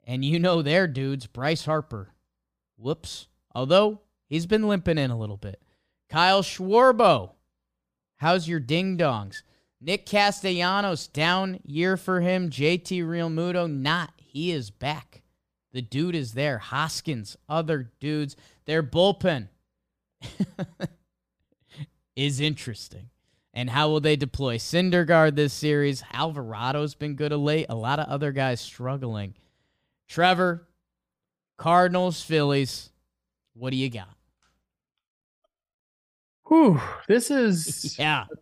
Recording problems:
none

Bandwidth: 15 kHz